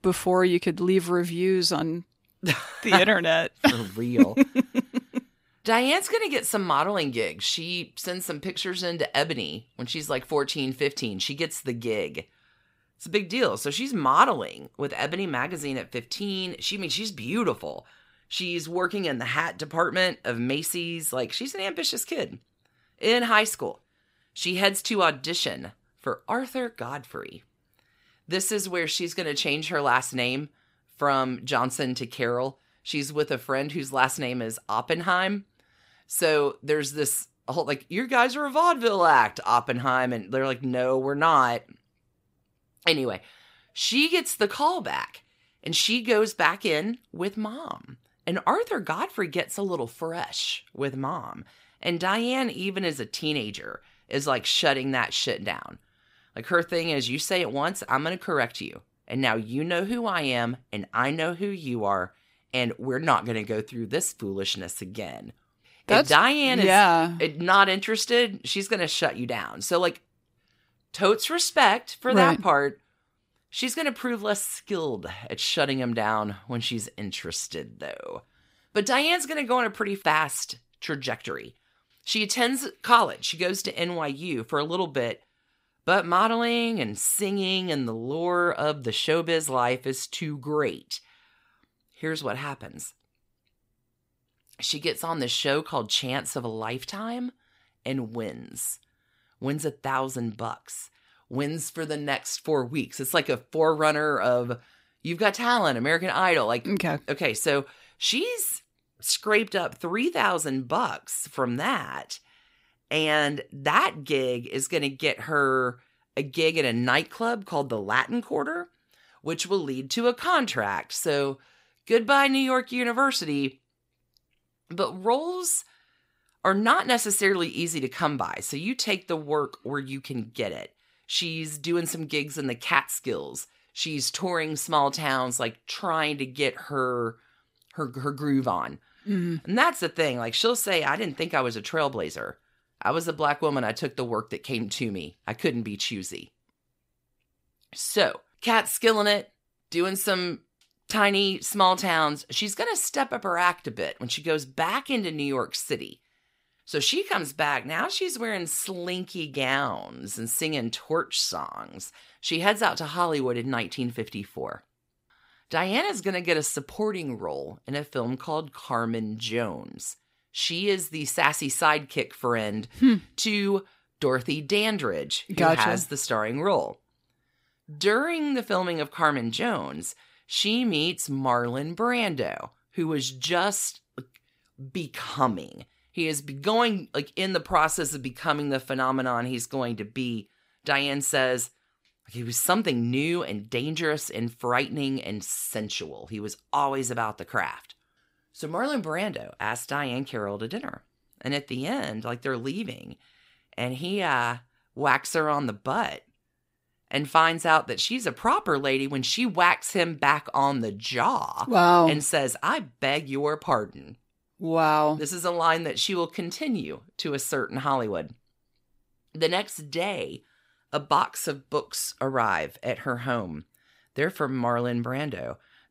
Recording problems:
none

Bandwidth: 15.5 kHz